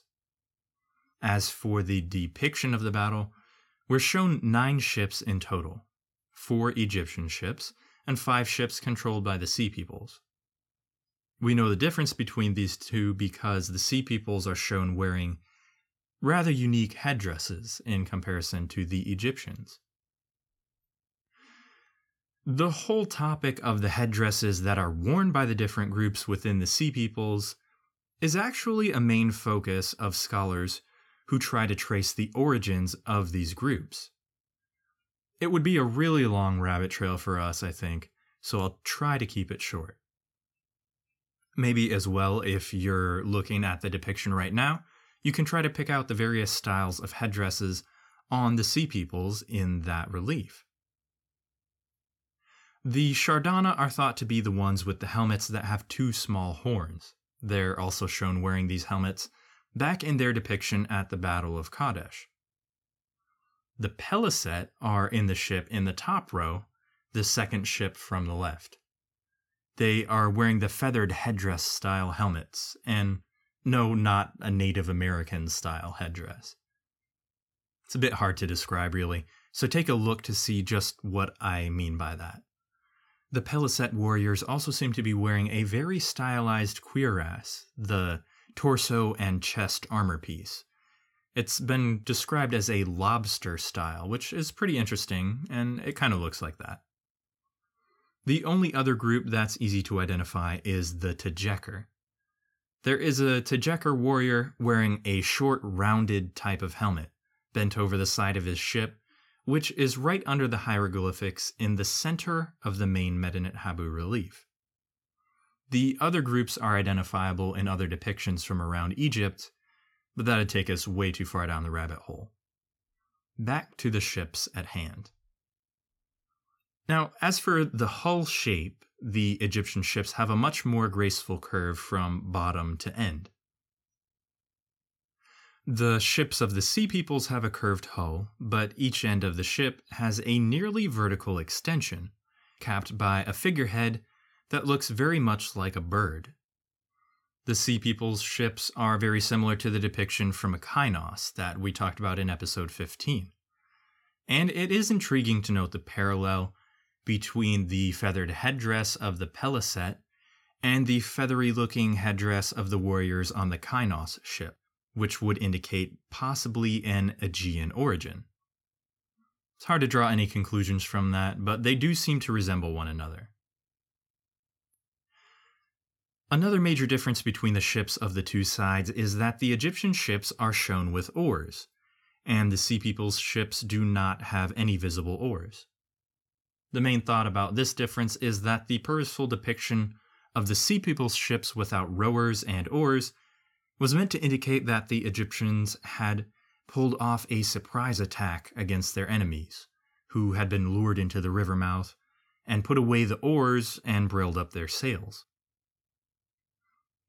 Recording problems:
none

